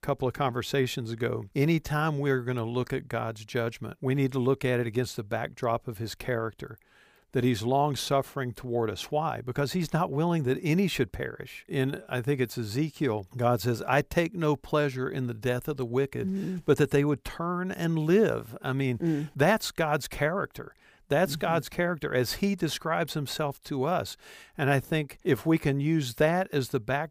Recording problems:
none

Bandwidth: 15 kHz